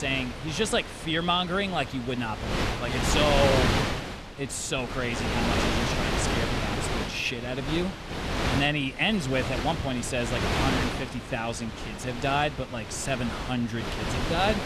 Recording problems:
wind noise on the microphone; heavy; 2 dB below the speech
abrupt cut into speech; at the start

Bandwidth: 13.5 kHz